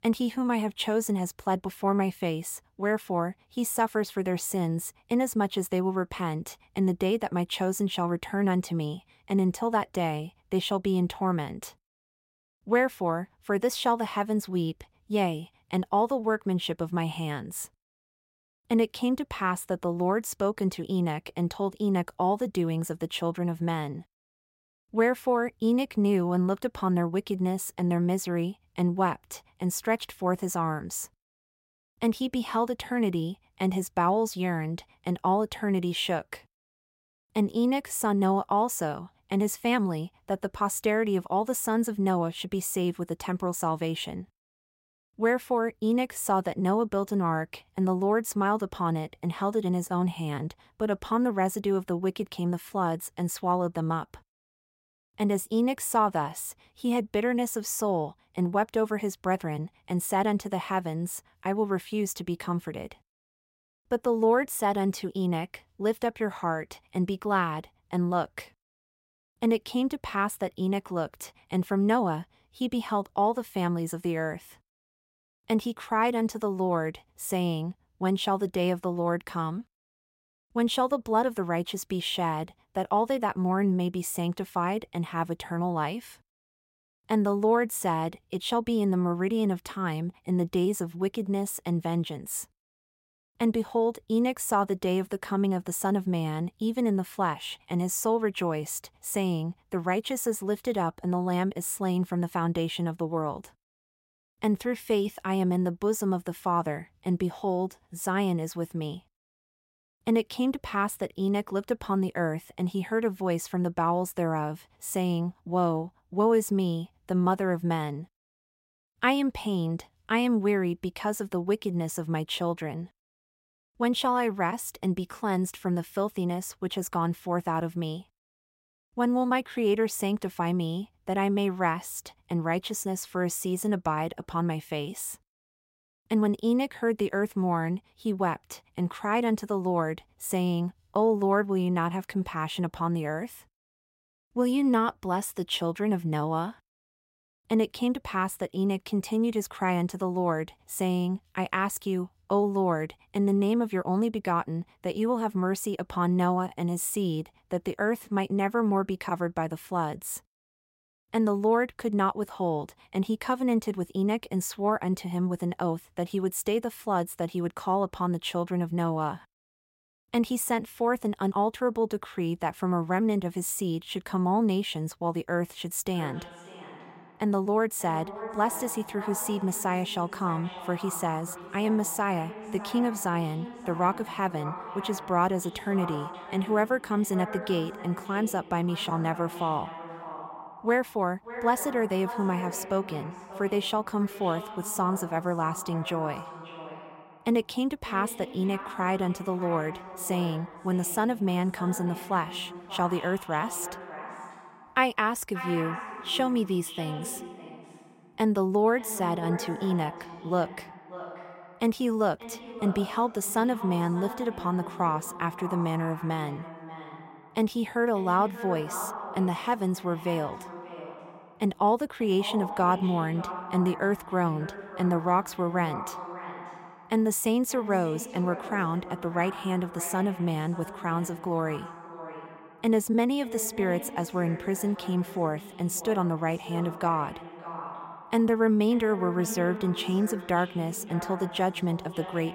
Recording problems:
echo of what is said; noticeable; from 2:56 on; 580 ms later, 10 dB below the speech

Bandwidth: 16 kHz